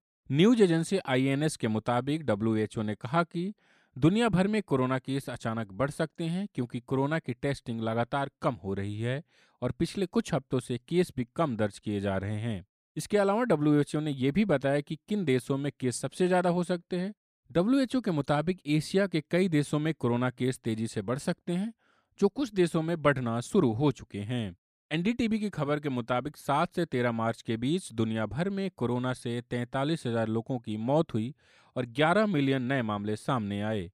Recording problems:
none

